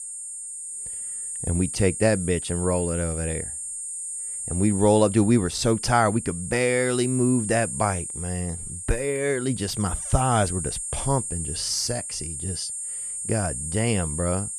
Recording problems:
high-pitched whine; loud; throughout; 8.5 kHz, 5 dB below the speech

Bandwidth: 14.5 kHz